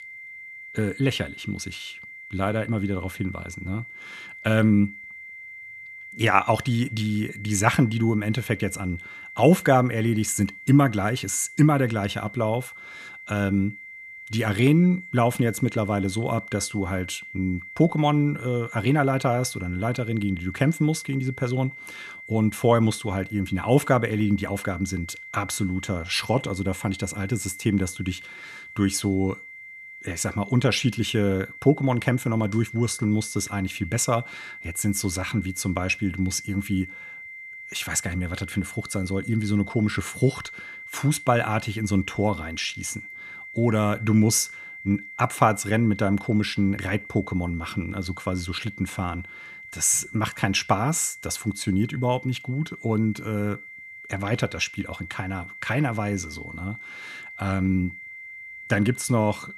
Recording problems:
high-pitched whine; noticeable; throughout; 2 kHz, 15 dB below the speech

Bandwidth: 14 kHz